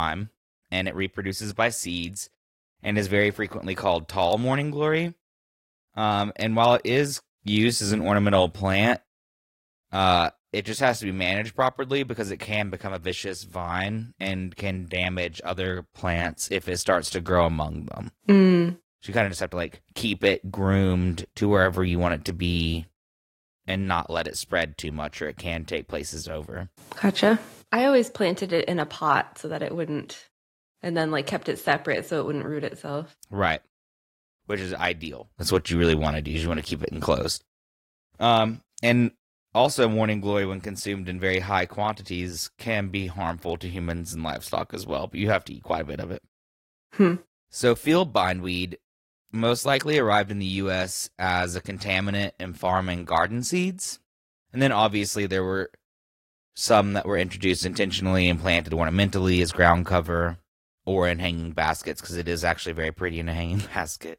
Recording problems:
garbled, watery; slightly; nothing above 16 kHz
abrupt cut into speech; at the start

